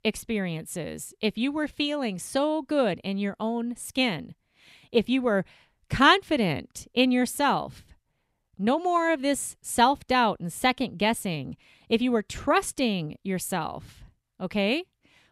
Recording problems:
none

